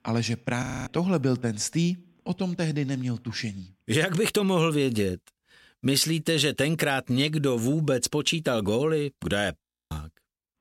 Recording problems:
audio freezing; at 0.5 s and at 9.5 s

